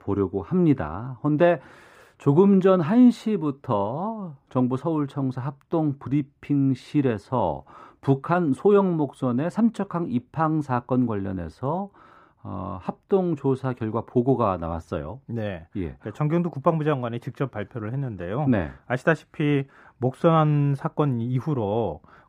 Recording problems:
muffled; slightly; fading above 3 kHz

